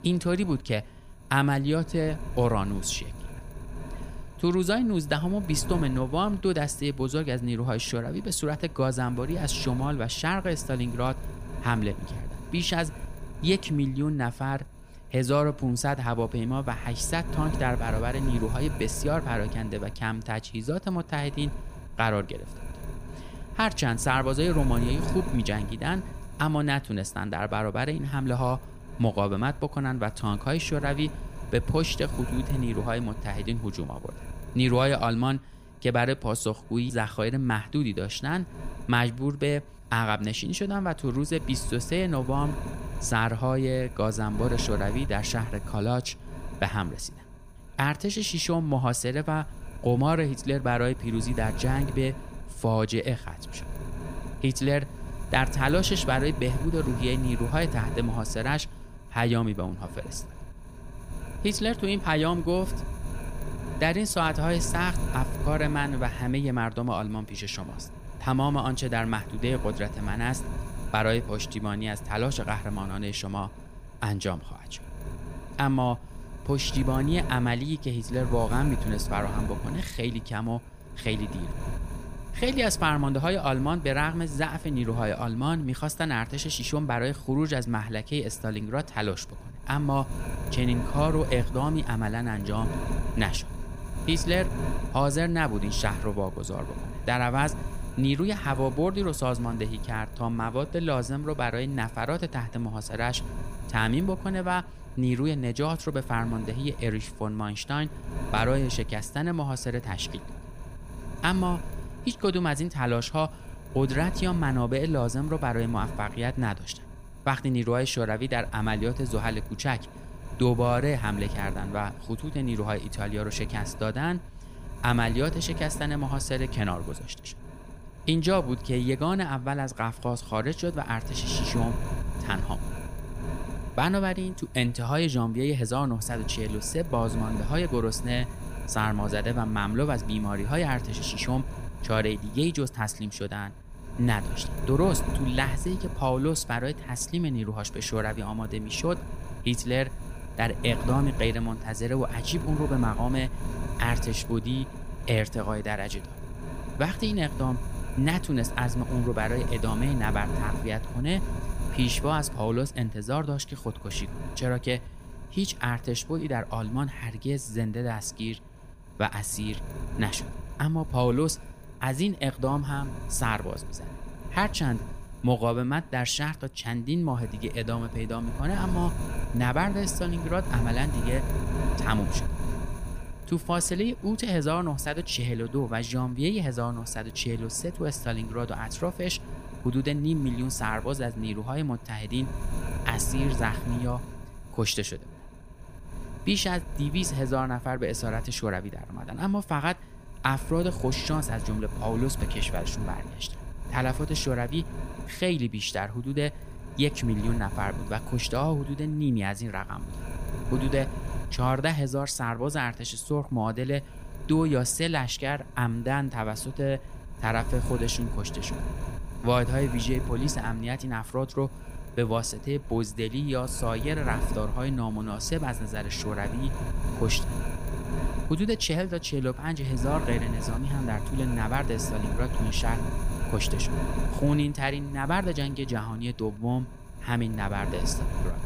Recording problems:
wind noise on the microphone; occasional gusts; 15 dB below the speech

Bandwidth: 15 kHz